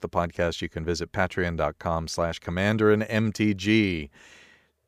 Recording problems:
none

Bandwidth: 15 kHz